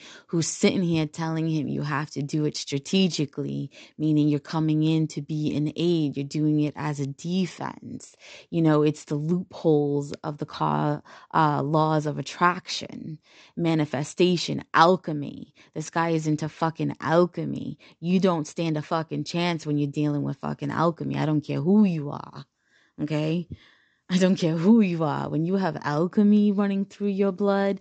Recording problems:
high frequencies cut off; noticeable; nothing above 8 kHz

